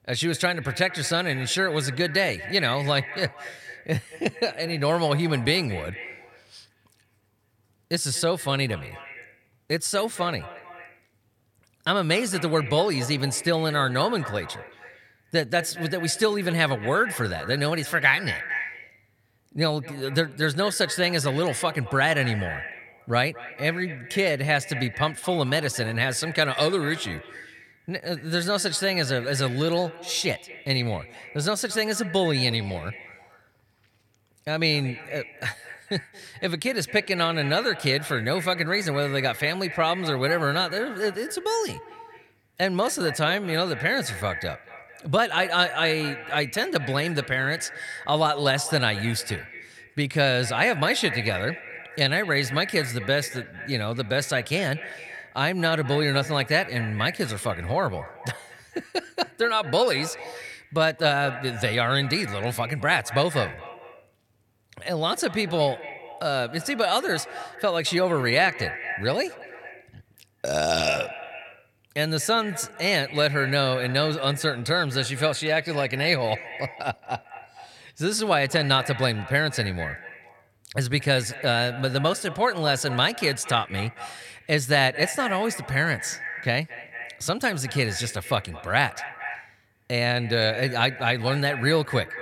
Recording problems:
echo of what is said; noticeable; throughout; 220 ms later, 15 dB below the speech

